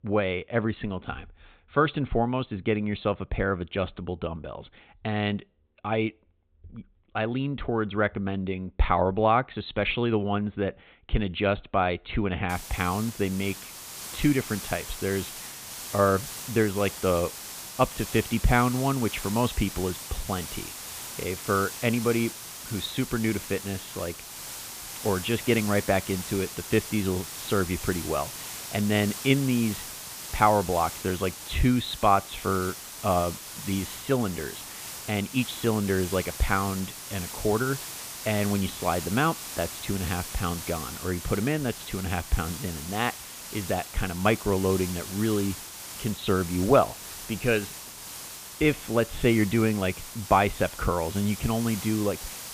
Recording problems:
high frequencies cut off; severe; nothing above 4 kHz
hiss; loud; from 13 s on; 9 dB below the speech

